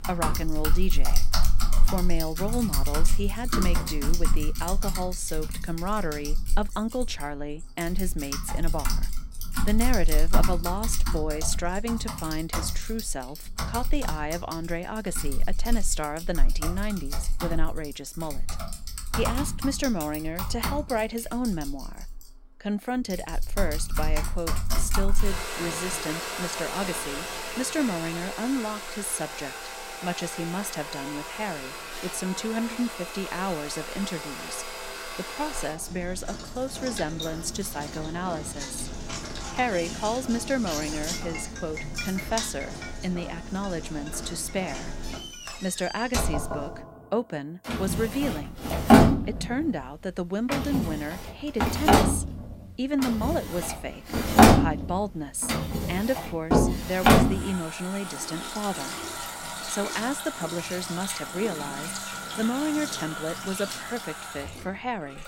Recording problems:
household noises; very loud; throughout; 2 dB above the speech

